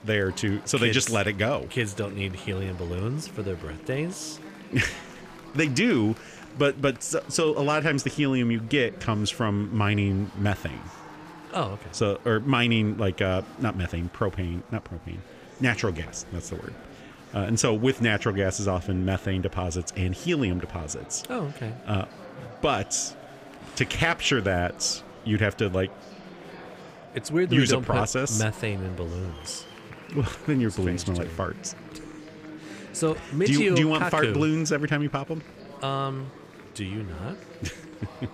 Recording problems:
murmuring crowd; noticeable; throughout; 20 dB below the speech

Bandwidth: 15 kHz